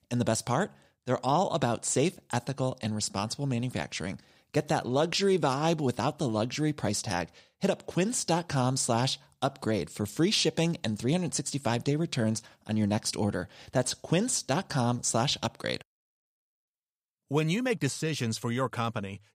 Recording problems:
none

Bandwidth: 15.5 kHz